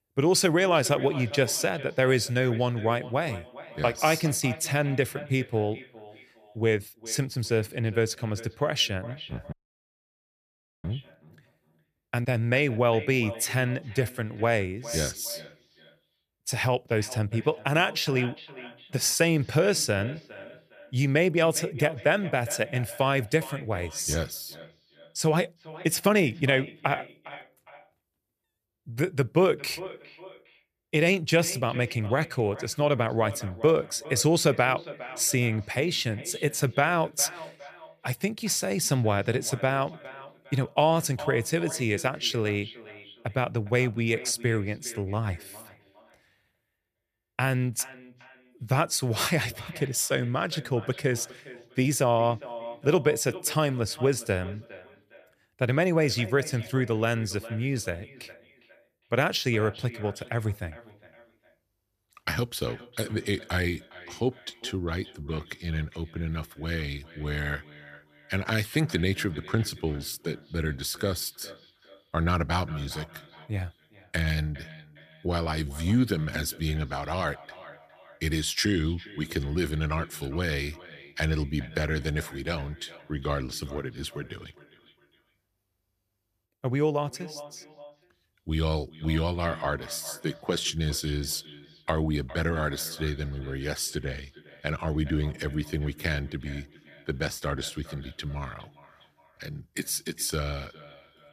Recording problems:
echo of what is said; noticeable; throughout; 410 ms later, 20 dB below the speech
audio cutting out; at 9.5 s for 1.5 s

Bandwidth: 14.5 kHz